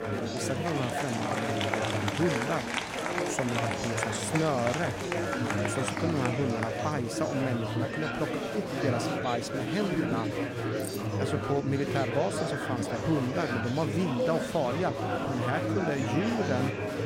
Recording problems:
murmuring crowd; very loud; throughout; 1 dB above the speech
jangling keys; faint; at 11 s; peak 10 dB below the speech

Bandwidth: 16 kHz